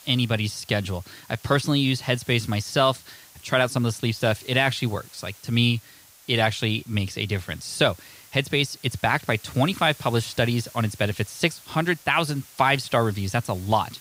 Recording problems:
hiss; faint; throughout; 20 dB below the speech

